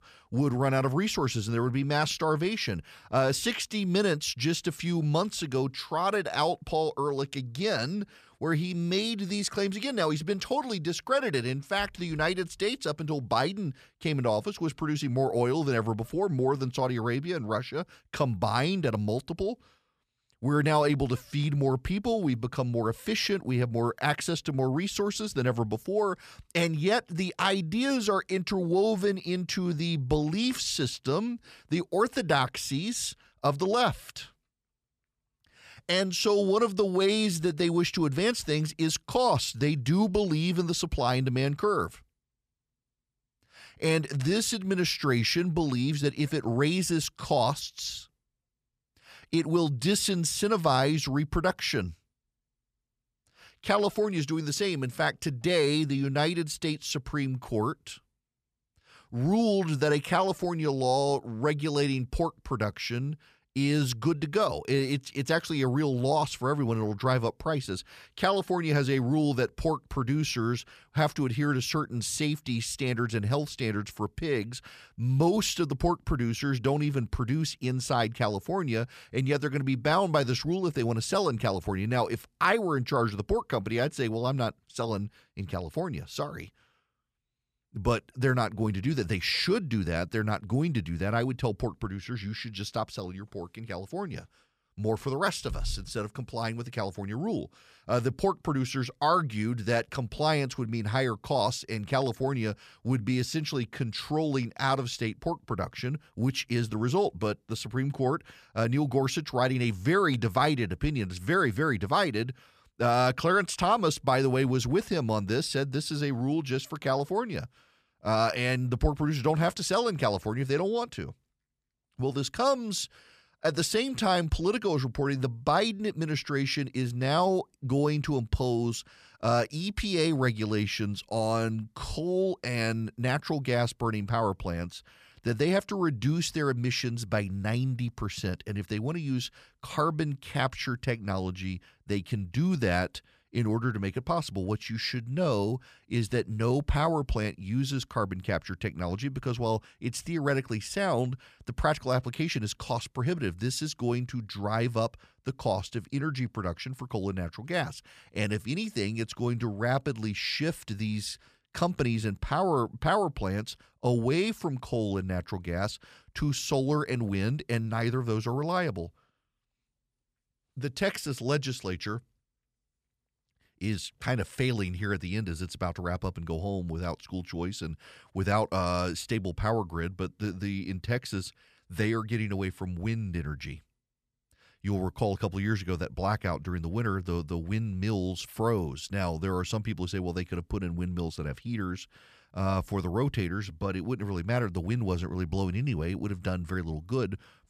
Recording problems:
none

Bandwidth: 14.5 kHz